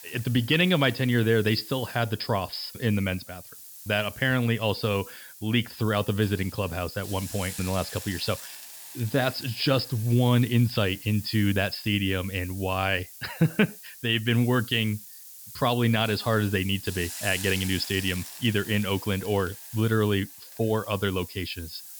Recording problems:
high frequencies cut off; noticeable; nothing above 5.5 kHz
hiss; noticeable; throughout; 15 dB below the speech

